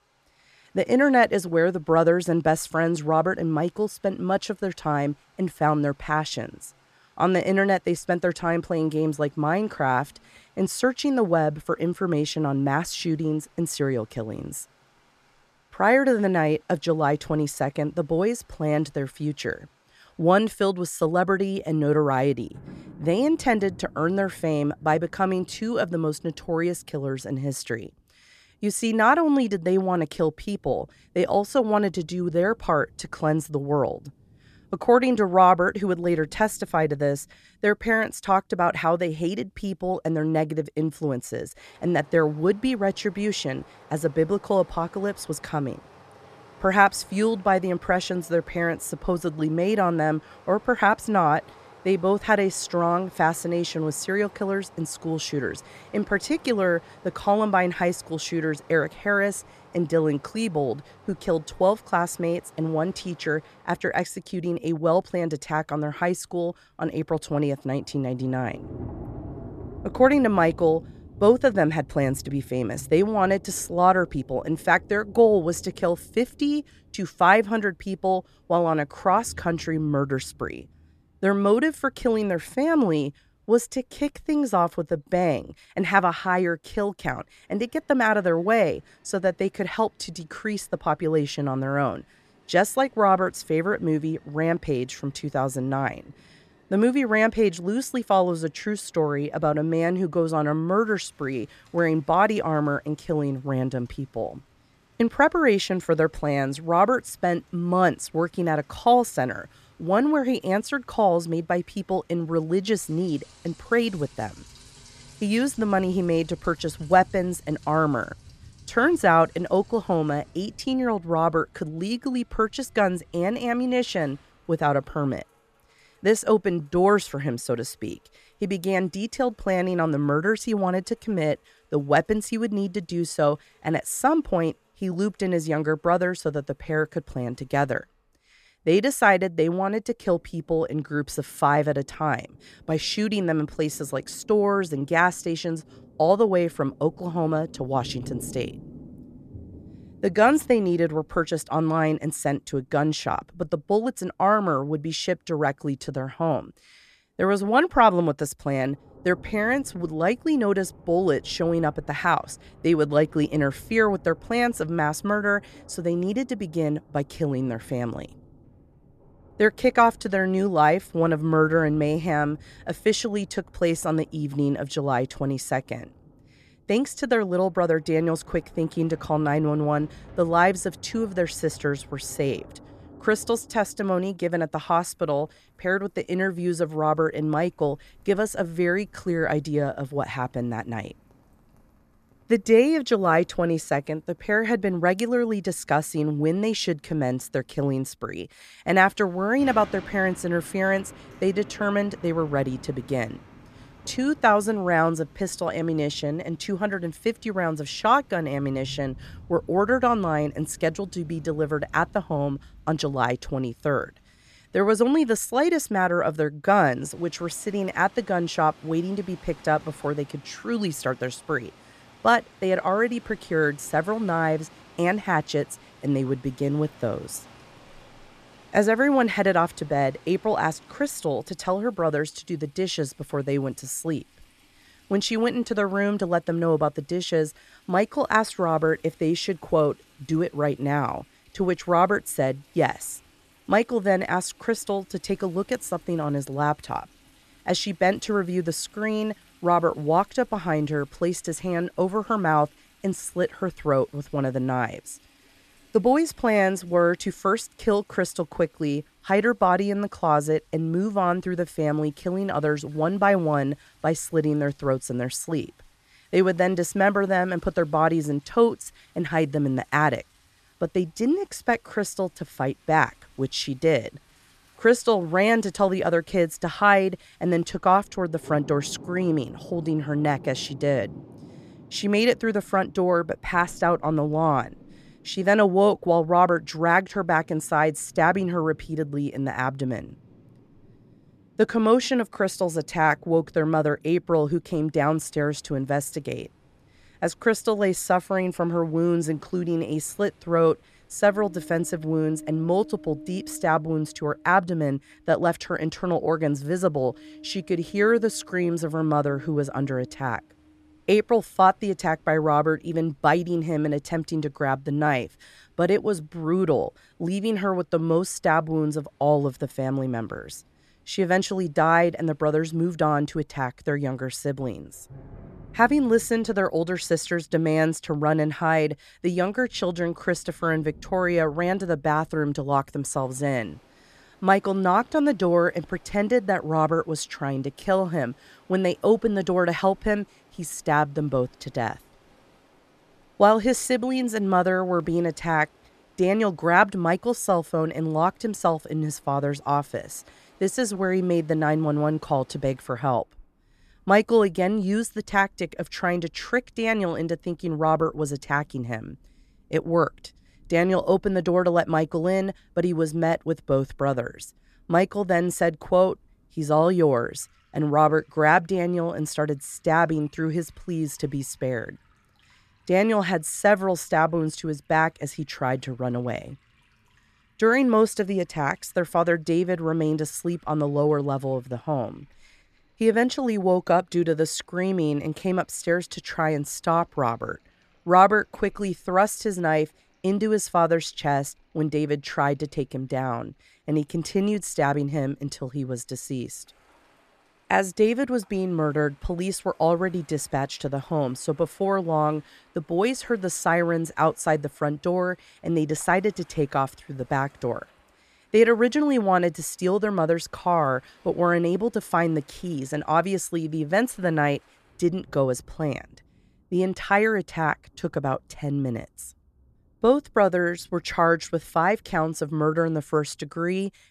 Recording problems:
rain or running water; faint; throughout; 25 dB below the speech

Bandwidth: 14 kHz